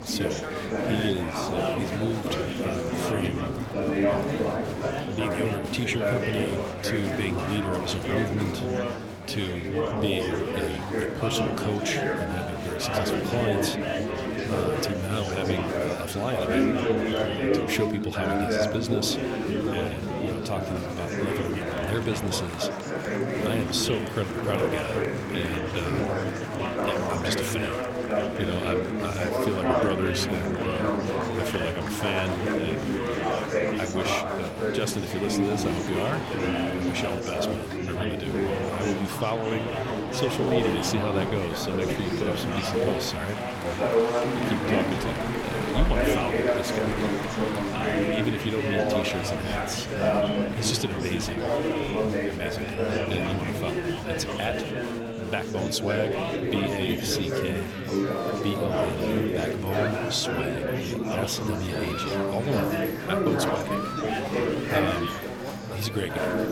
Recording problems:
chatter from many people; very loud; throughout; 4 dB above the speech

